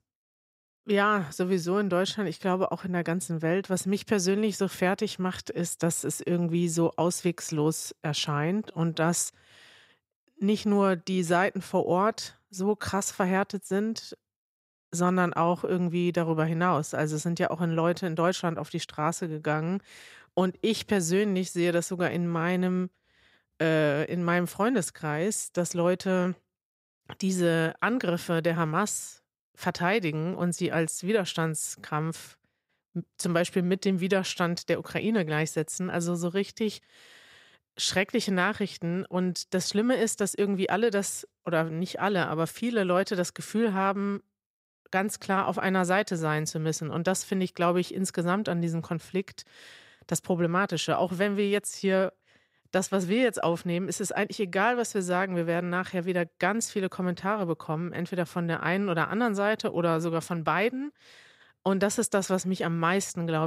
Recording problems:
abrupt cut into speech; at the end

